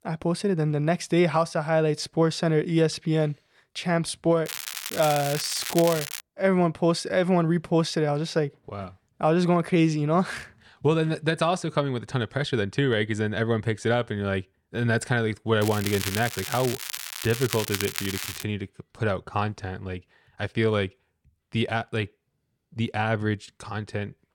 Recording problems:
crackling; loud; from 4.5 to 6 s and from 16 to 18 s; 6 dB below the speech

